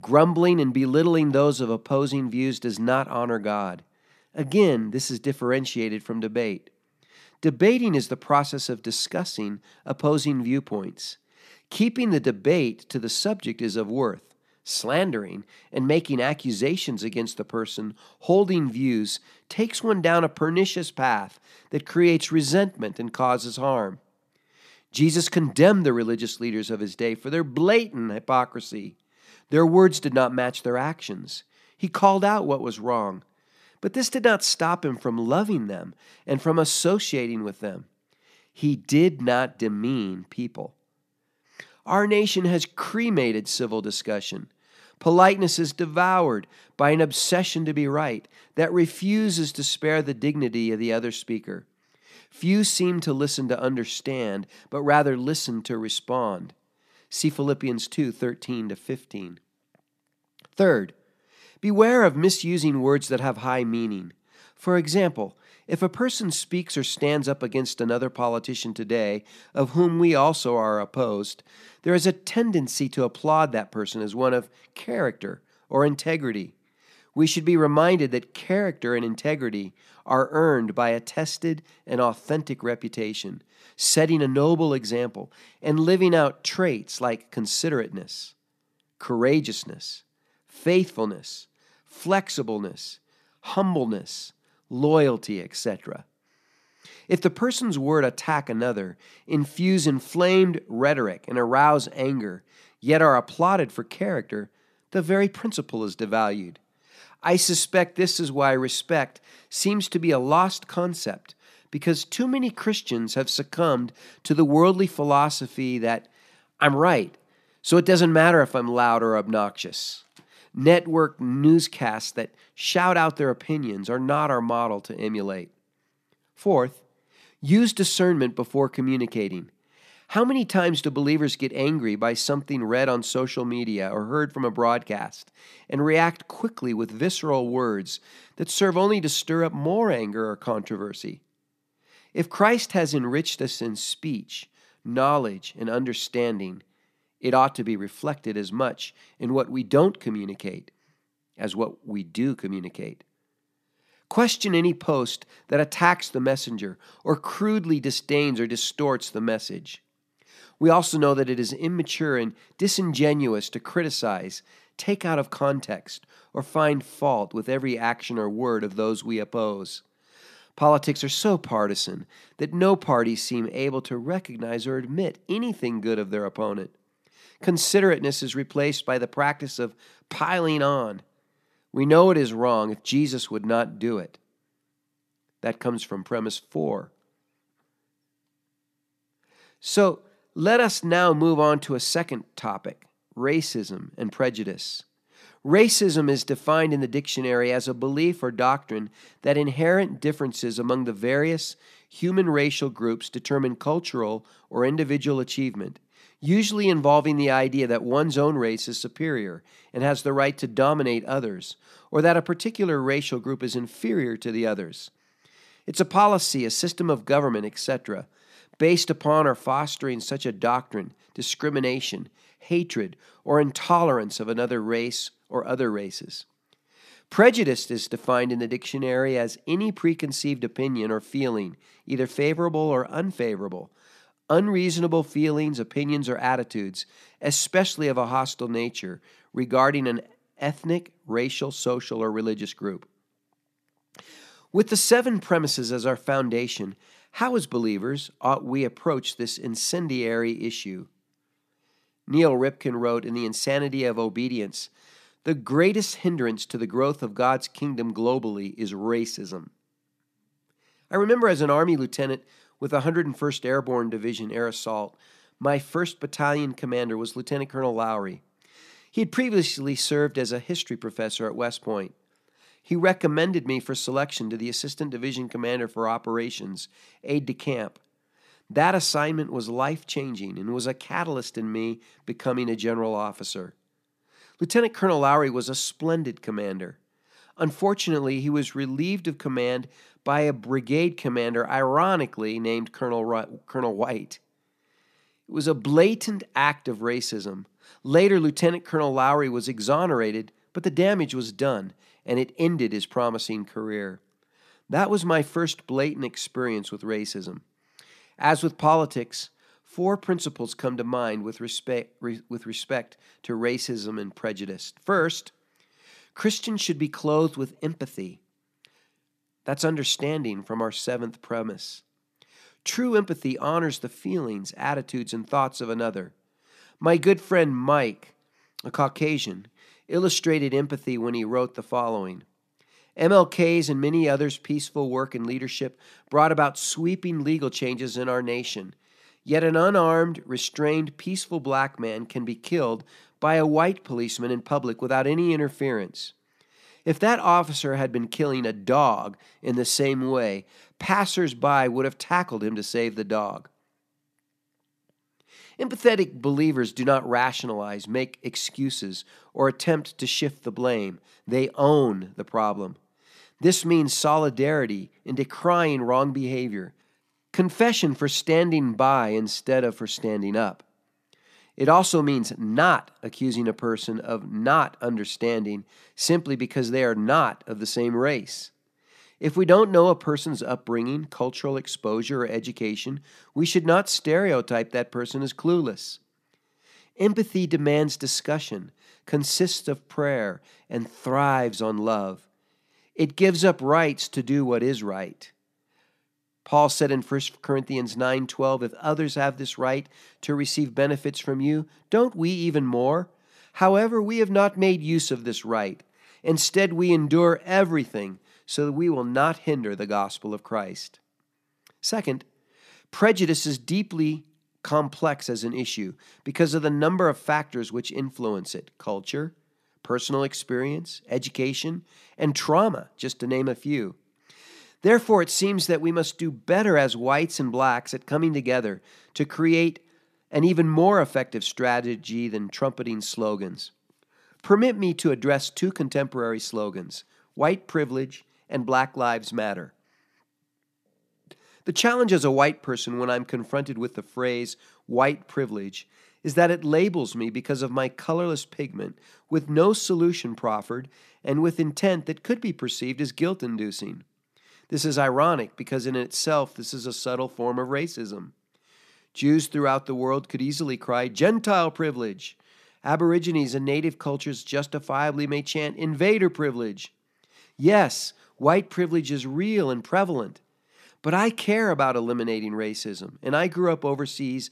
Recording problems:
none

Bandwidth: 14.5 kHz